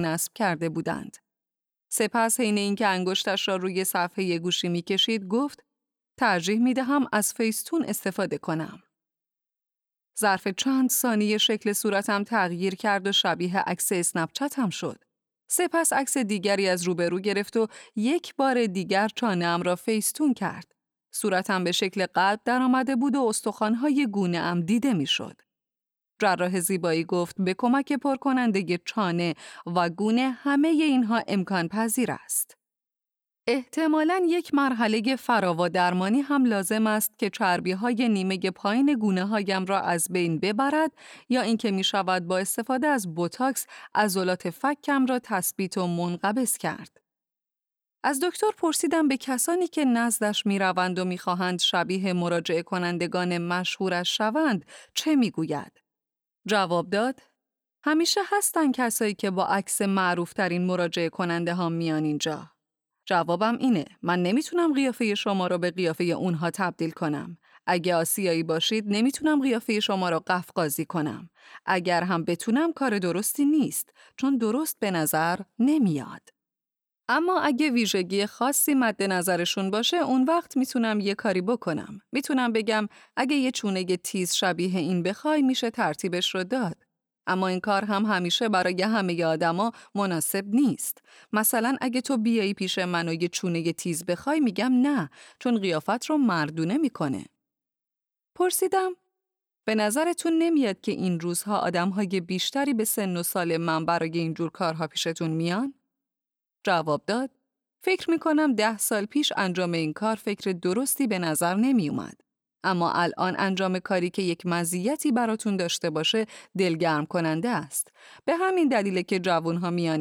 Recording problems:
abrupt cut into speech; at the start and the end

